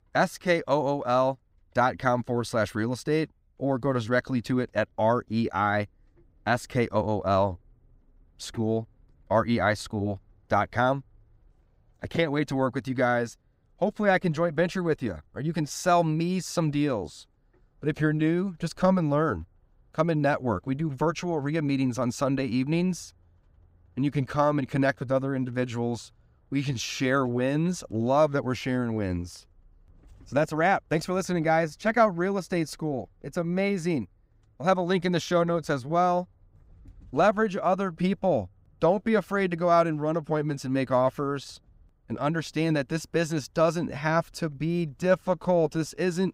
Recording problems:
none

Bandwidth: 15.5 kHz